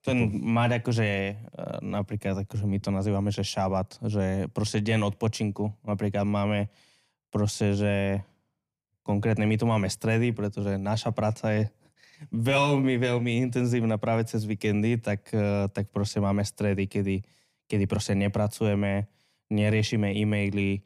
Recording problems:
none

